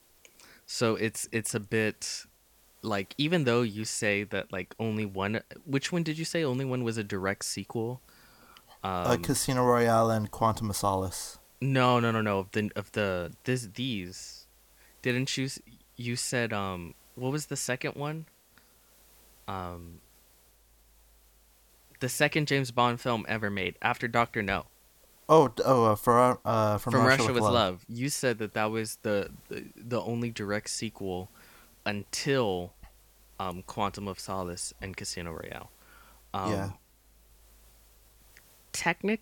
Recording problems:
hiss; faint; throughout; 30 dB below the speech

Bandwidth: 17.5 kHz